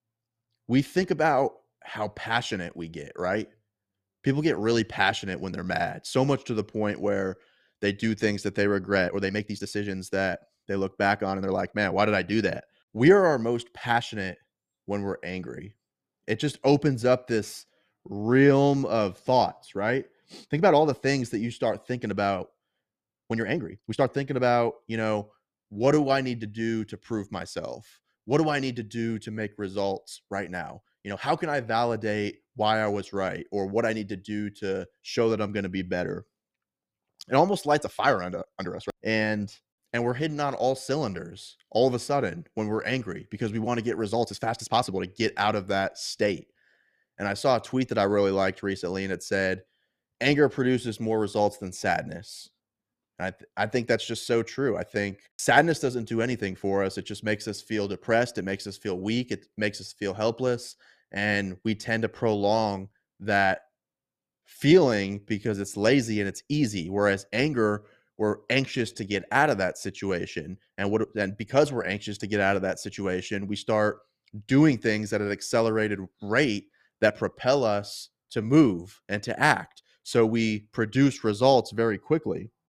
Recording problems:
uneven, jittery; strongly; from 9 s to 1:19

